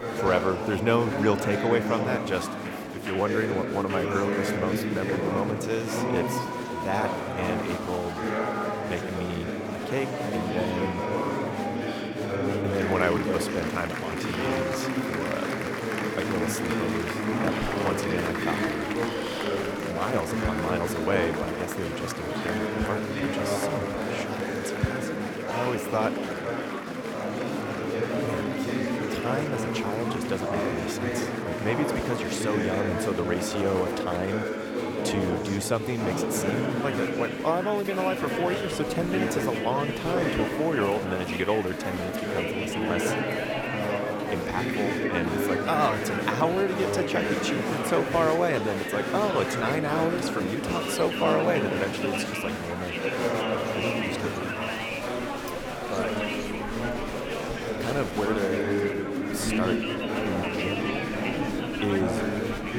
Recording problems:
murmuring crowd; very loud; throughout; 1 dB above the speech

